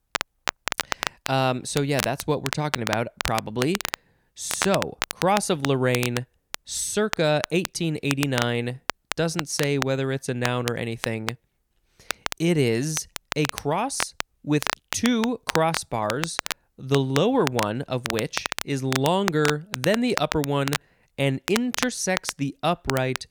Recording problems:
crackle, like an old record; loud; 6 dB below the speech

